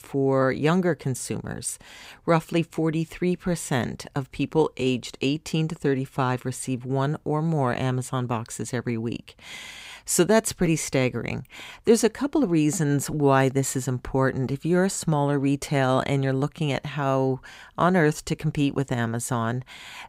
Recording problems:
none

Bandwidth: 15.5 kHz